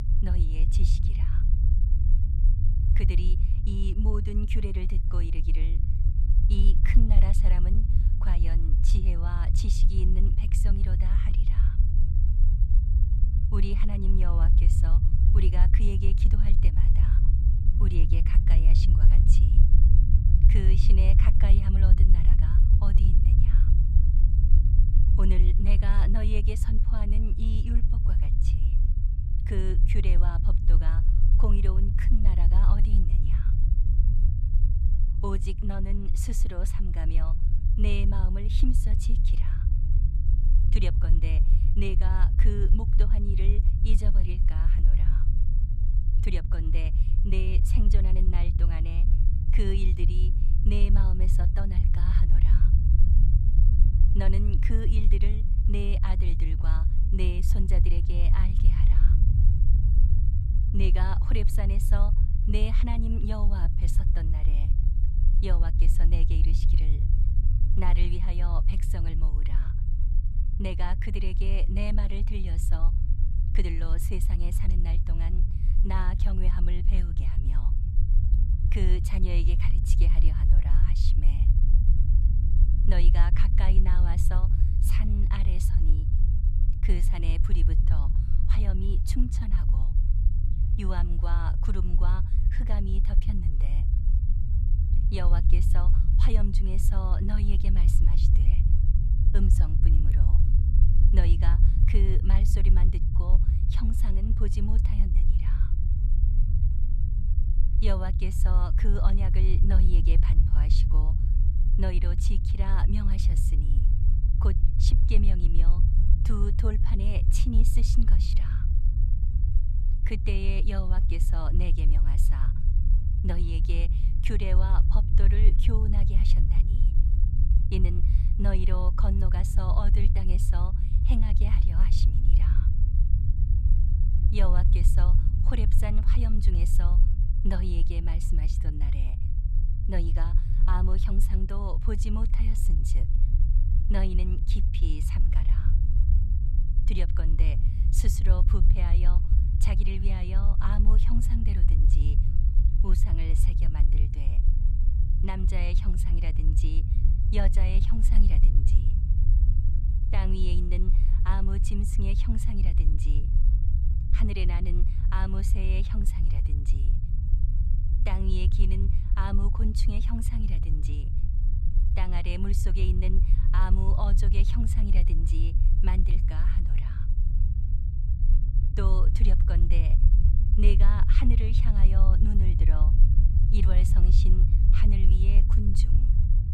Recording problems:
low rumble; loud; throughout; 3 dB below the speech

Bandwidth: 13.5 kHz